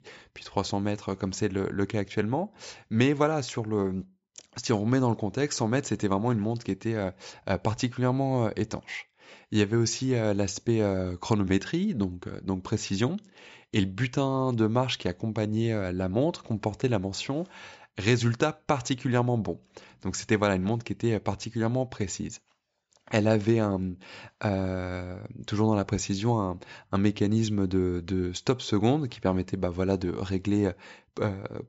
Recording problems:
high frequencies cut off; noticeable; nothing above 8 kHz

